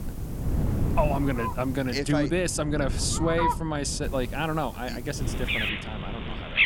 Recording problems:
animal sounds; loud; throughout; 3 dB below the speech
wind noise on the microphone; occasional gusts; 15 dB below the speech
hiss; faint; until 2 s and from 4 to 5.5 s; 20 dB below the speech

